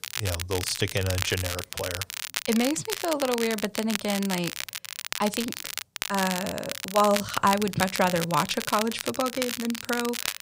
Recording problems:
crackle, like an old record; loud; 5 dB below the speech

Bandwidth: 15.5 kHz